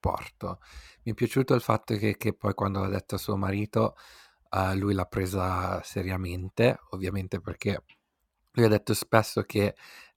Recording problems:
none

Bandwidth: 17 kHz